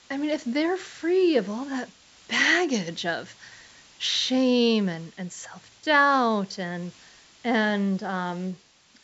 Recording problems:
high frequencies cut off; noticeable; nothing above 8 kHz
hiss; faint; throughout; 25 dB below the speech

